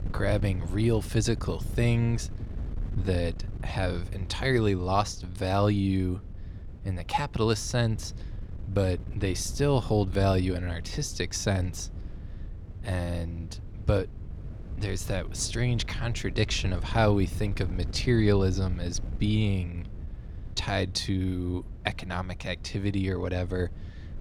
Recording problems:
wind noise on the microphone; occasional gusts; 20 dB below the speech

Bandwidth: 17 kHz